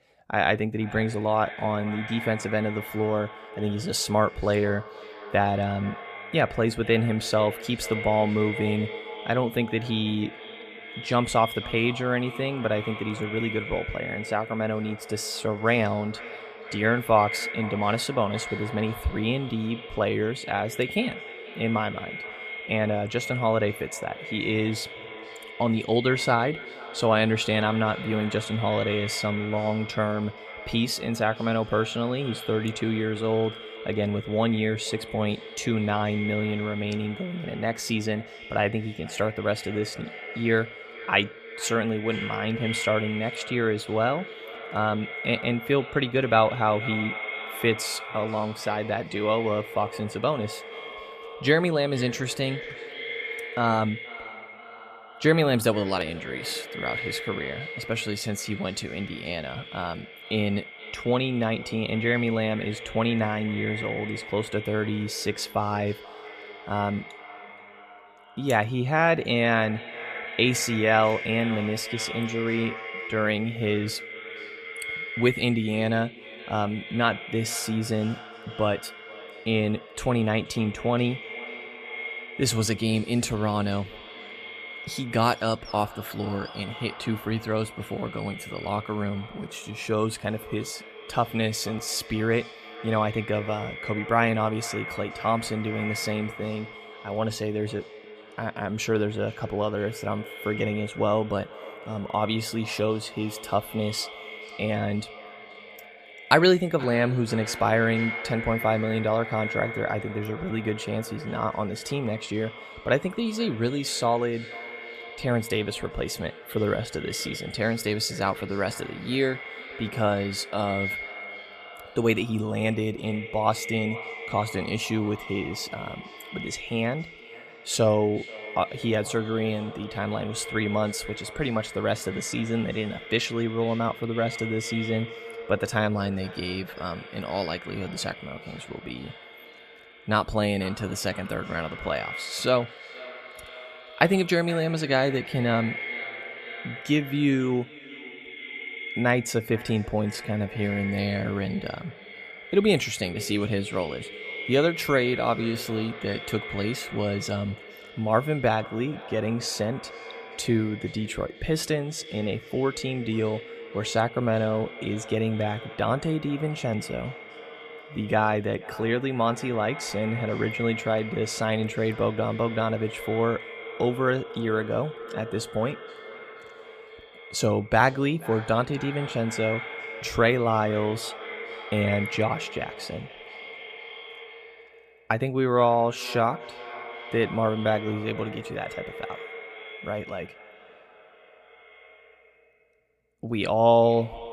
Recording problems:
echo of what is said; strong; throughout; 480 ms later, 10 dB below the speech

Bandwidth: 14.5 kHz